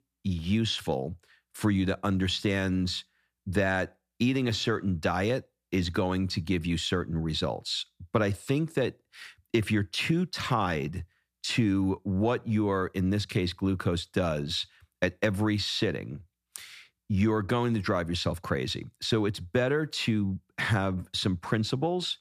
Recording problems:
none

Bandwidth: 14.5 kHz